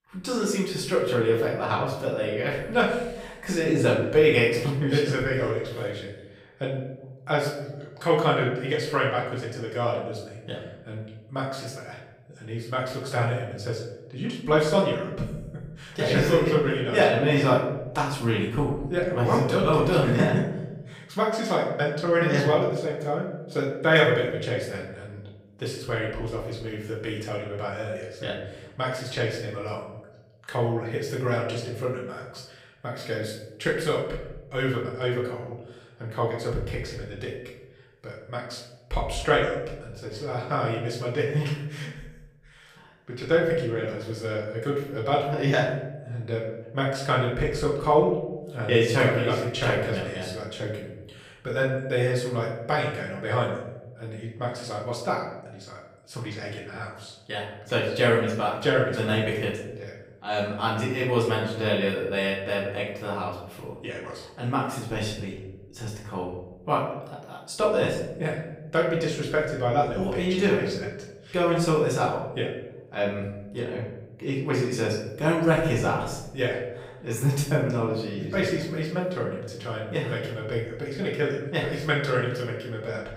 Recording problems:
off-mic speech; far
room echo; noticeable; dies away in 0.8 s

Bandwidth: 15.5 kHz